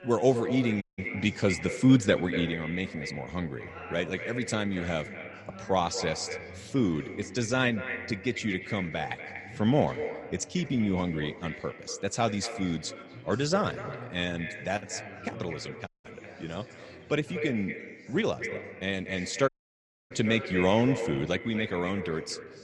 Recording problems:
echo of what is said; strong; throughout; 240 ms later, 9 dB below the speech
chatter from many people; noticeable; throughout; 20 dB below the speech
audio cutting out; at 1 s, at 16 s and at 19 s for 0.5 s

